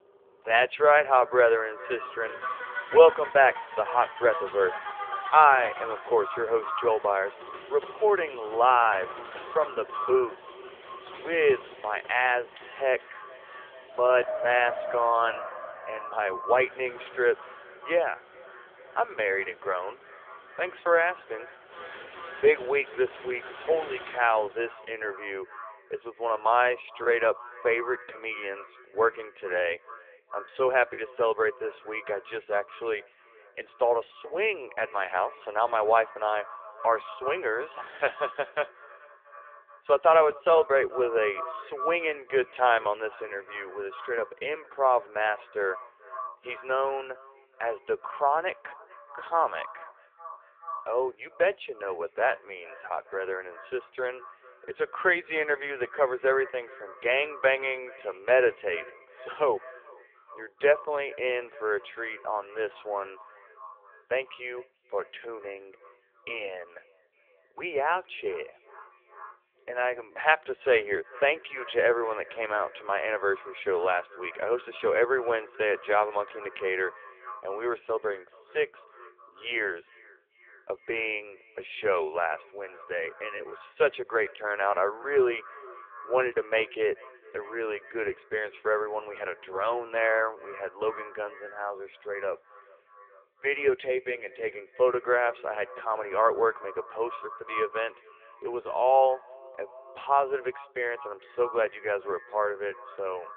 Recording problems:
phone-call audio; poor line
echo of what is said; noticeable; throughout; 430 ms later, 15 dB below the speech
traffic noise; noticeable; until 24 s; 15 dB below the speech
choppy; occasionally; from 27 to 31 s; 3% of the speech affected

